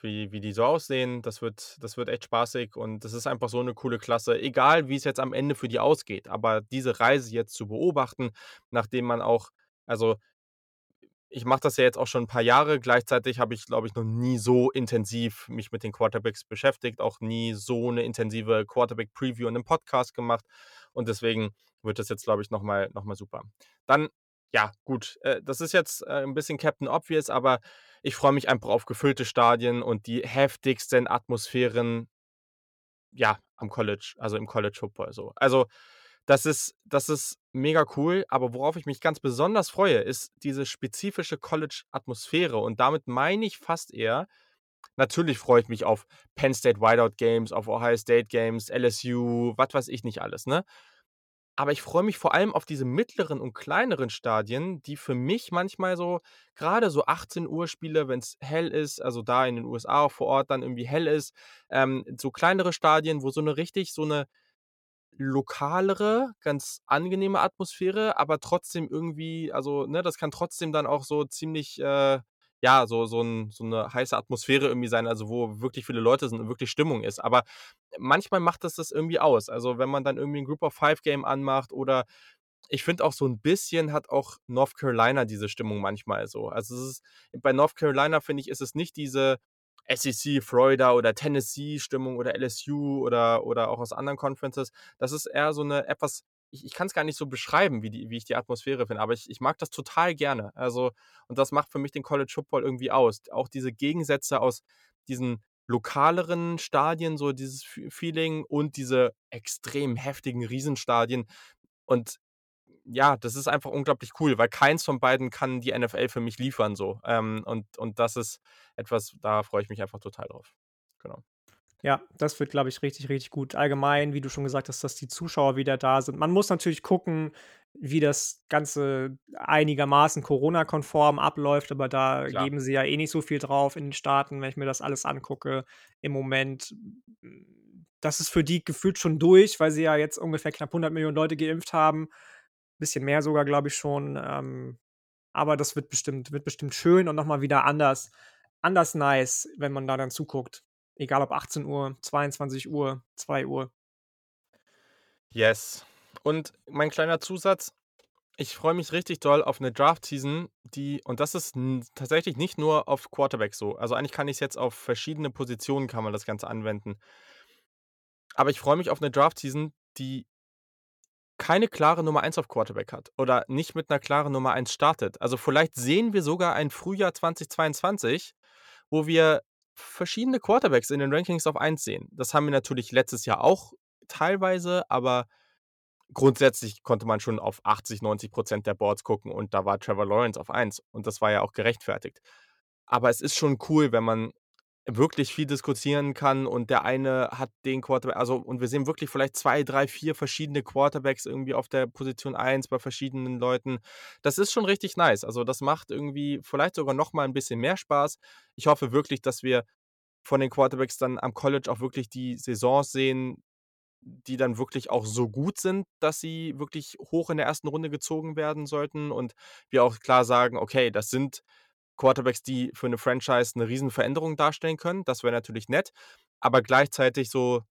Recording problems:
none

